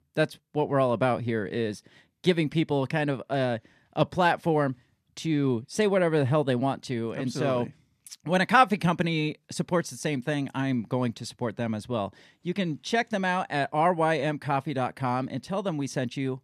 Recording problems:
none

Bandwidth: 14 kHz